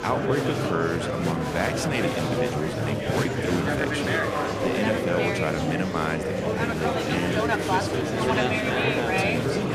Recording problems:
murmuring crowd; very loud; throughout; 4 dB above the speech

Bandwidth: 14.5 kHz